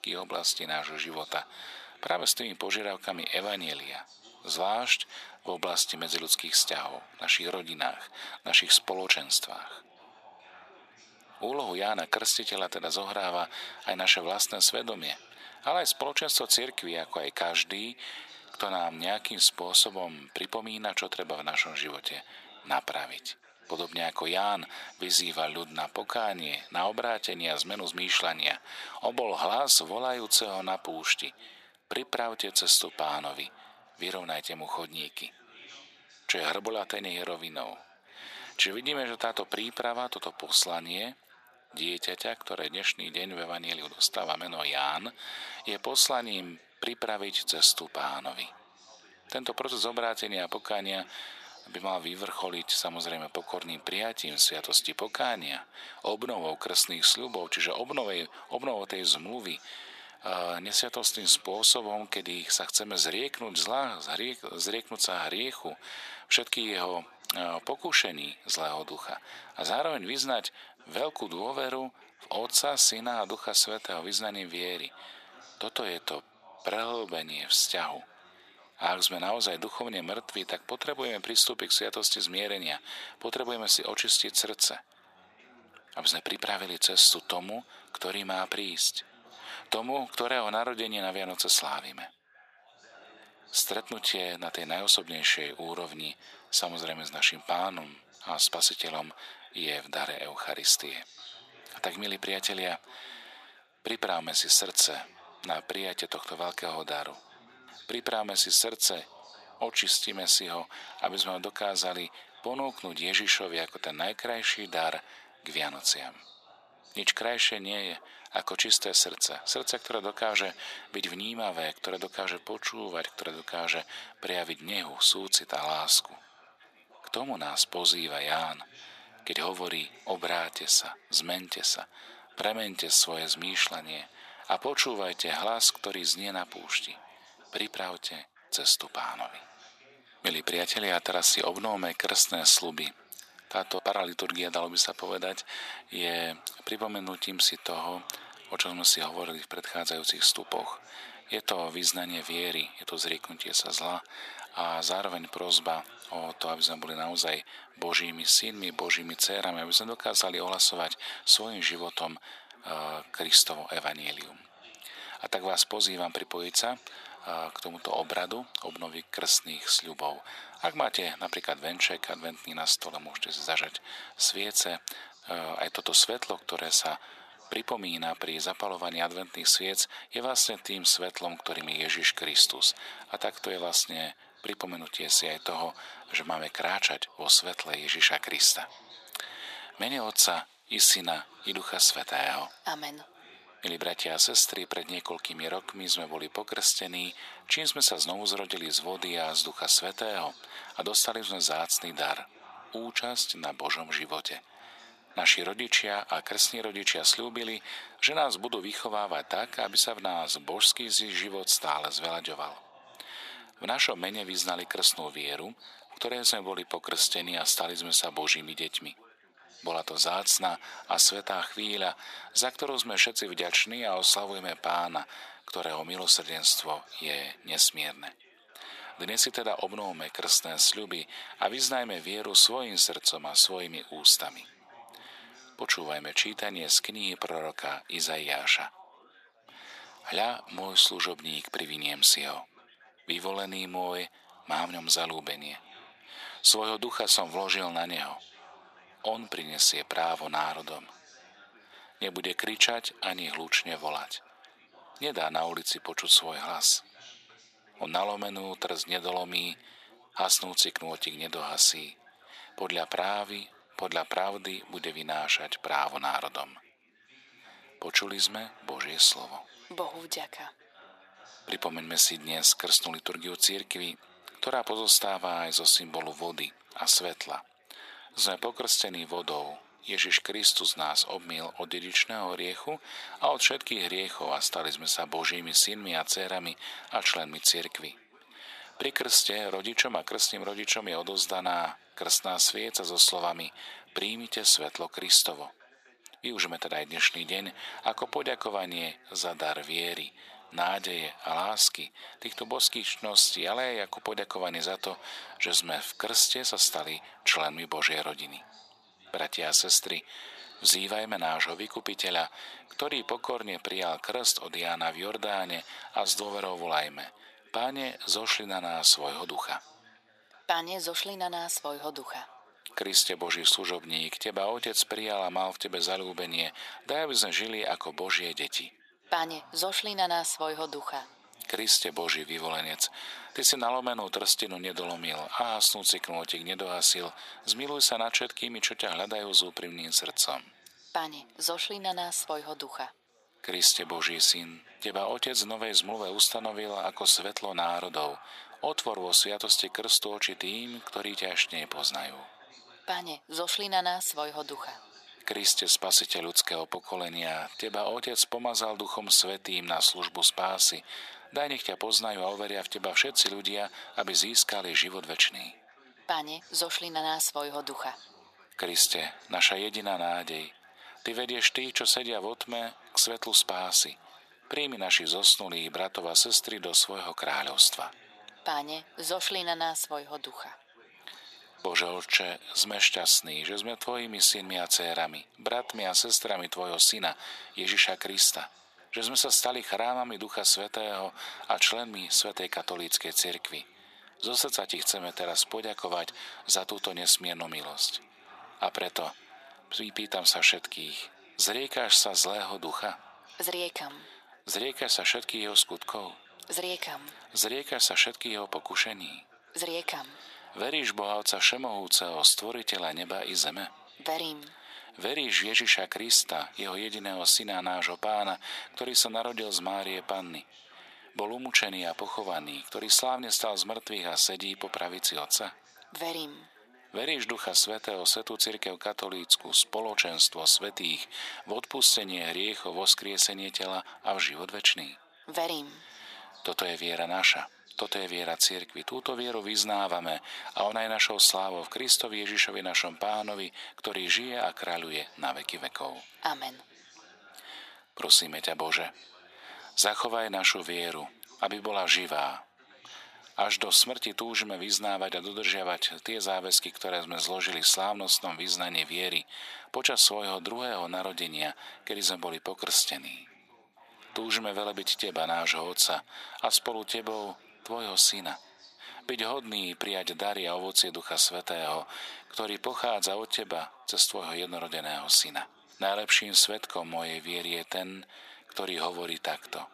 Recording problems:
thin; very; fading below 650 Hz
background chatter; faint; throughout; 4 voices, 25 dB below the speech

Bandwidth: 14.5 kHz